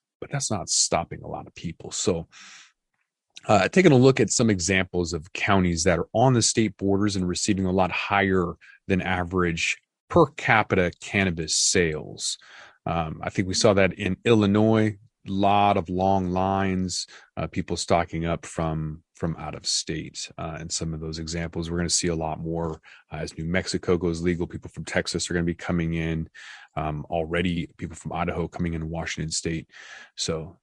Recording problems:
garbled, watery; slightly

